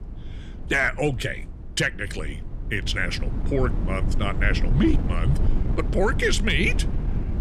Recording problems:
wind noise on the microphone; occasional gusts; 15 dB below the speech

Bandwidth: 14.5 kHz